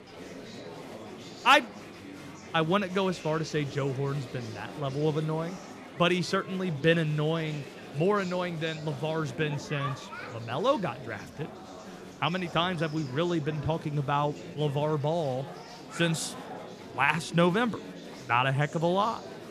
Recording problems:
murmuring crowd; noticeable; throughout; 15 dB below the speech

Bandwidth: 14.5 kHz